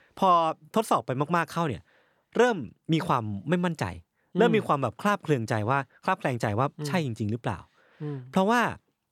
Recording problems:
none

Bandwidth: 18.5 kHz